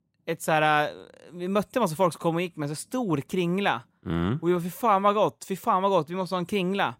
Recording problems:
none

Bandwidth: 16 kHz